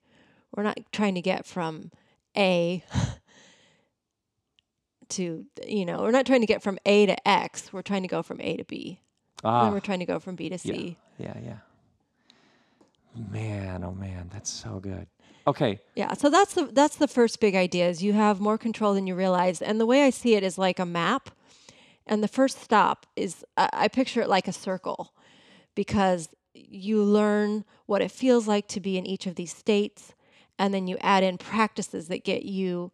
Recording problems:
none

